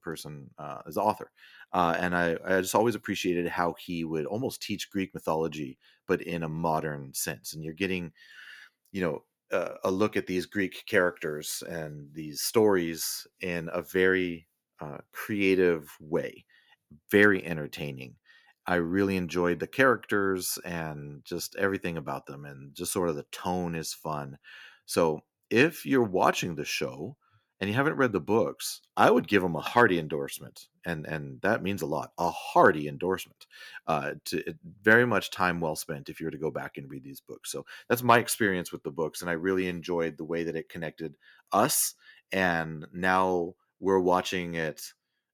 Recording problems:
none

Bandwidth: 18.5 kHz